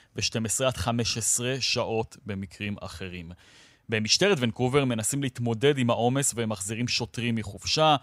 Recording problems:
none

